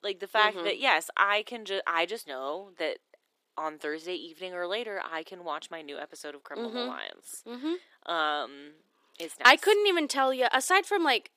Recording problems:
thin; somewhat; fading below 300 Hz

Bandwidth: 15 kHz